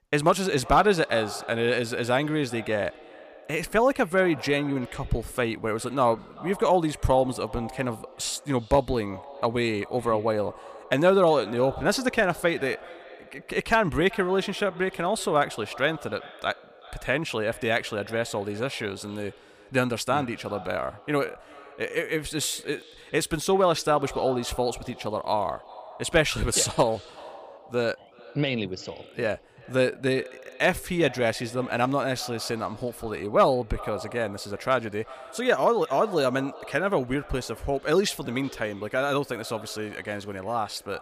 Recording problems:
echo of what is said; faint; throughout; 380 ms later, 20 dB below the speech

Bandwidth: 15 kHz